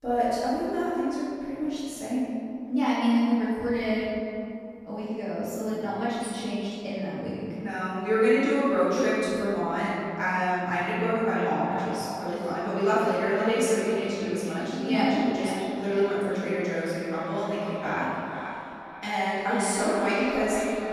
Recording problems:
echo of what is said; strong; from 11 s on; 480 ms later, 10 dB below the speech
room echo; strong; dies away in 2.3 s
off-mic speech; far

